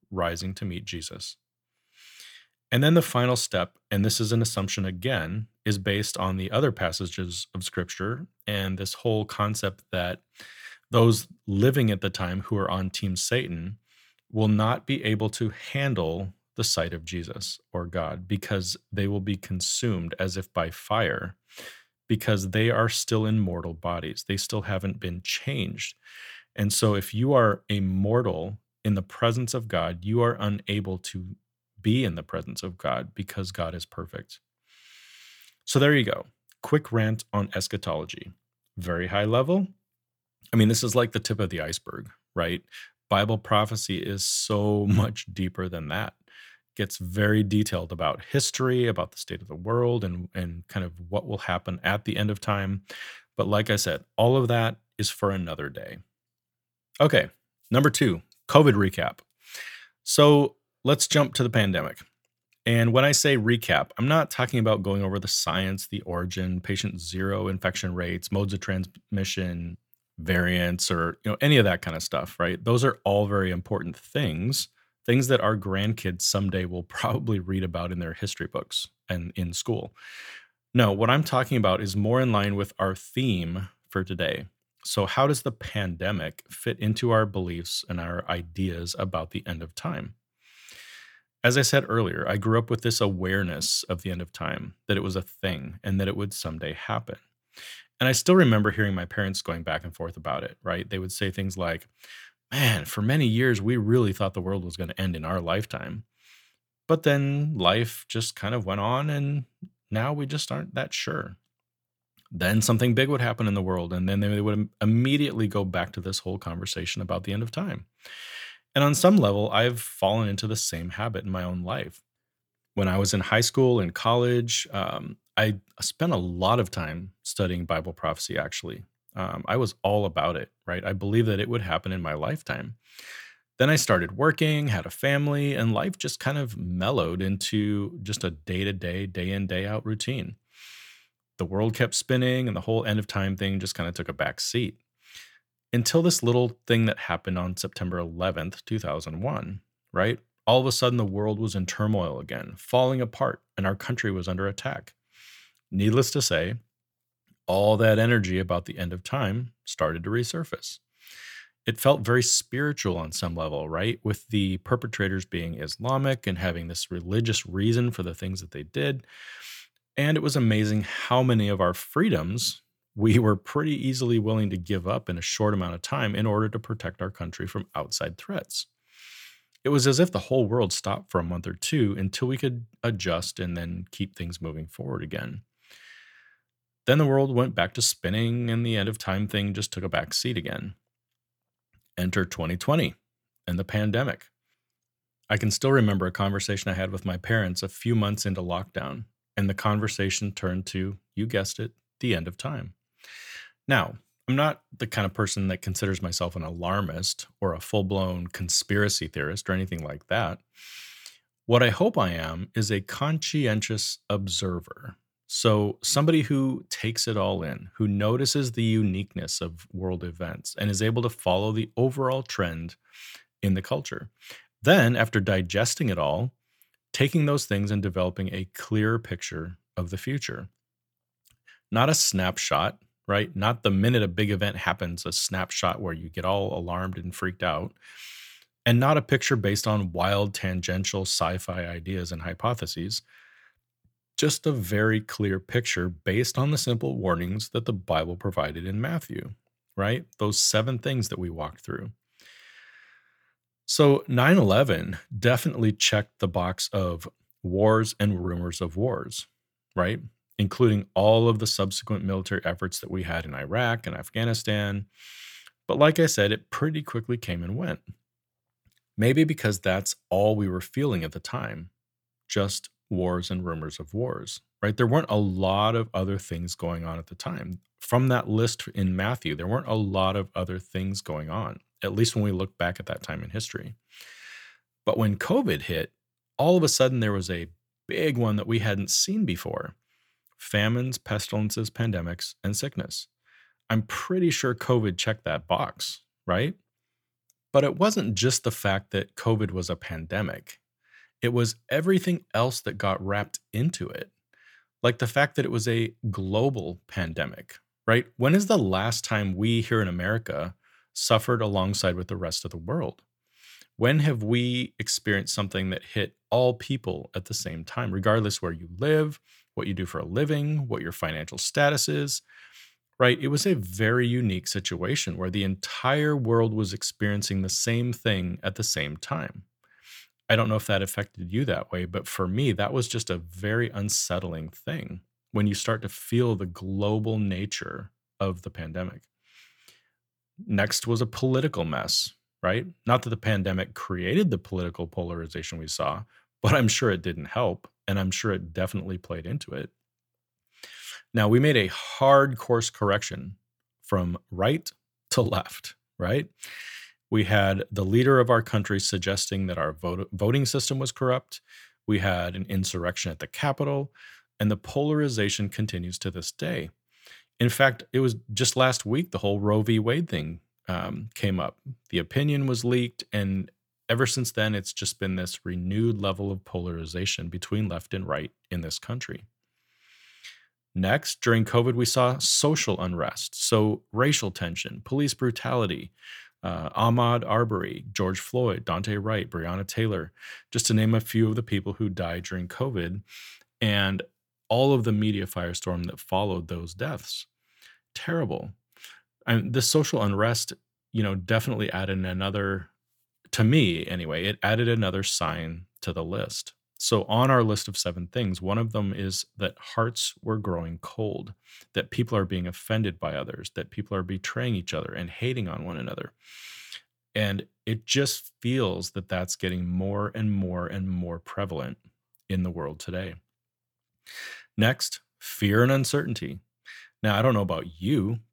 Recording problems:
none

